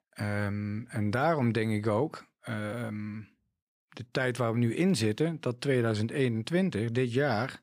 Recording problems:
none

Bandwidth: 15 kHz